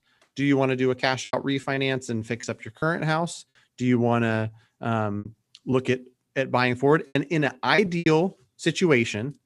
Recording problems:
choppy; very; from 1.5 to 3 s and from 5 to 8 s; 8% of the speech affected

